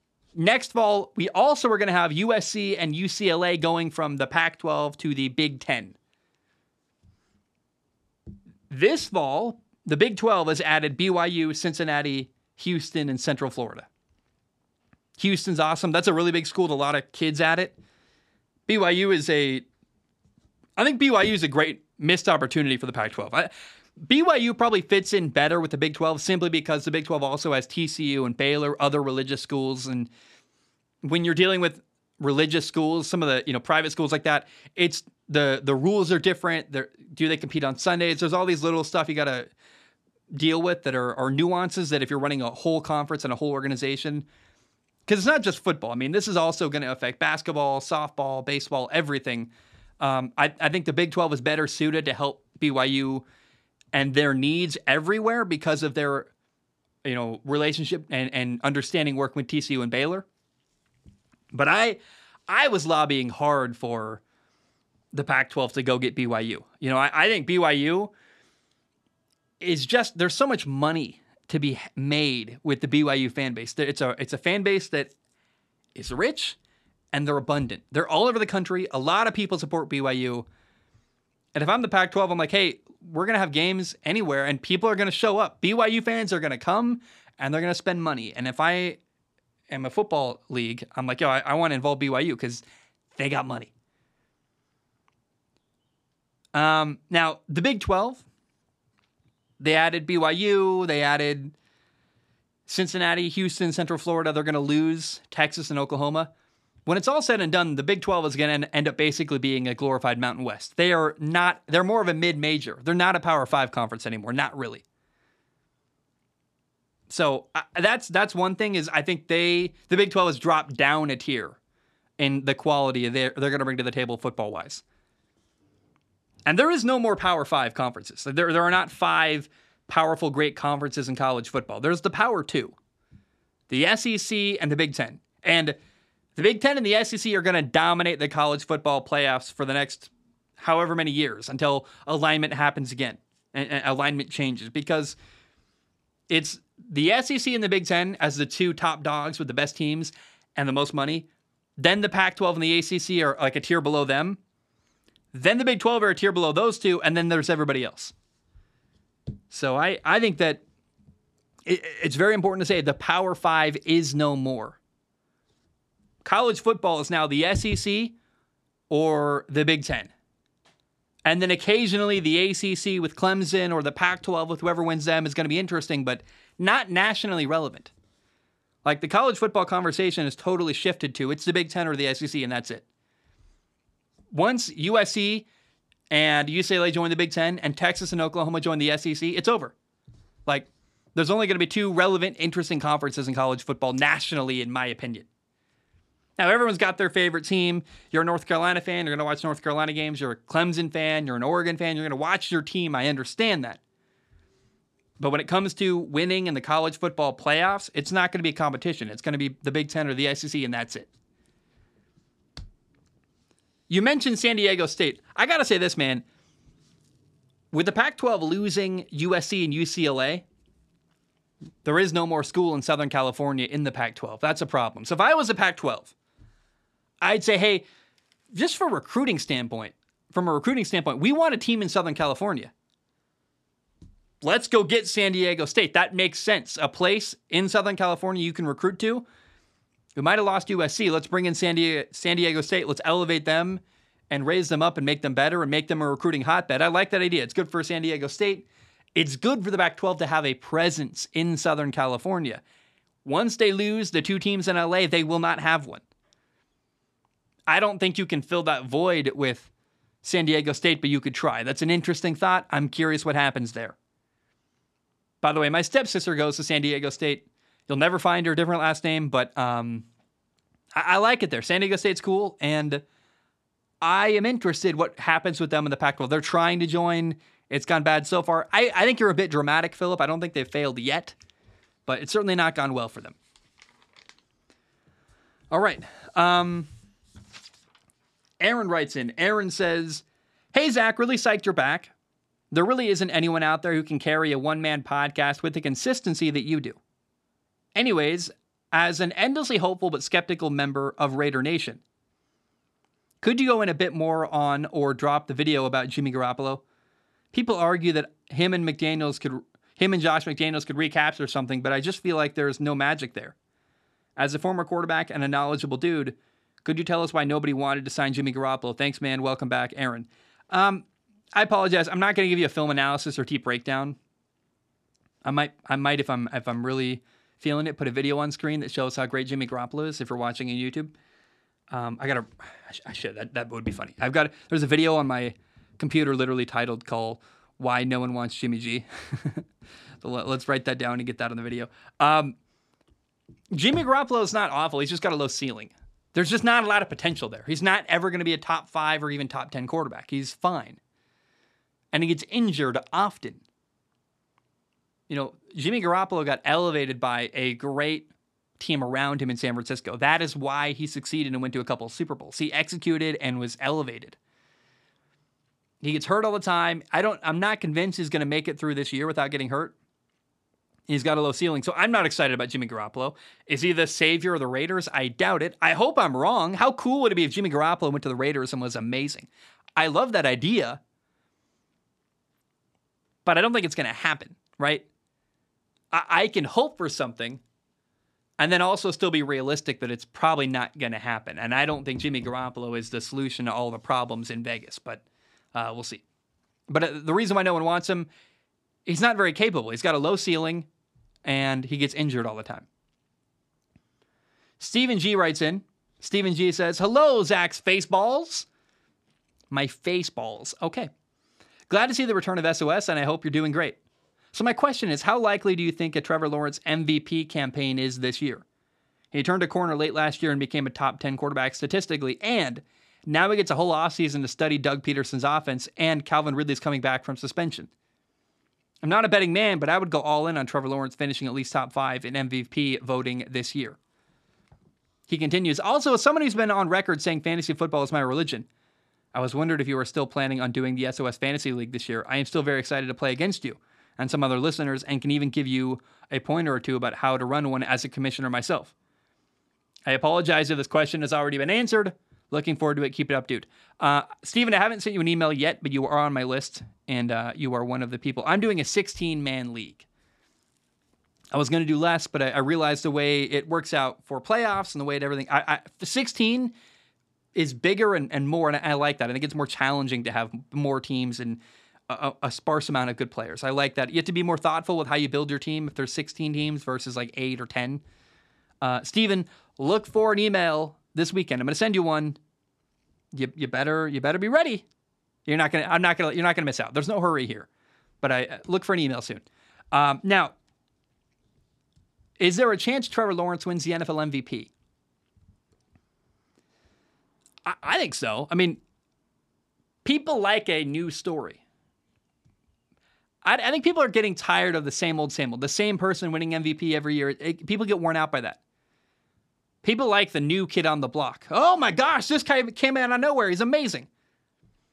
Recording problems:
none

